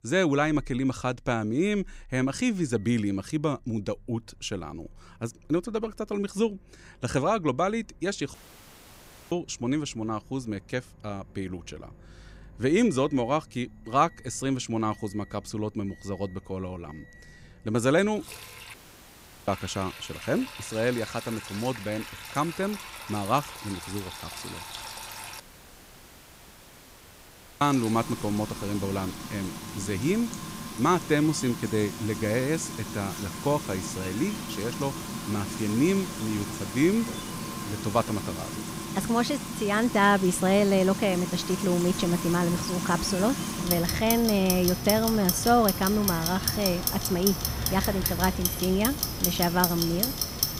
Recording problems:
household noises; loud; throughout; 5 dB below the speech
animal sounds; faint; throughout; 25 dB below the speech
audio cutting out; at 8.5 s for 1 s, at 19 s for 0.5 s and at 25 s for 2 s

